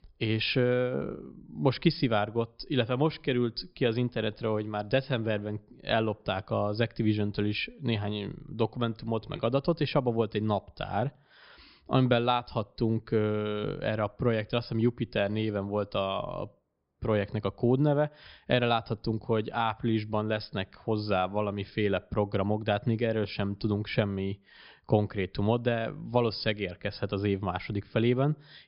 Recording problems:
high frequencies cut off; noticeable; nothing above 5.5 kHz

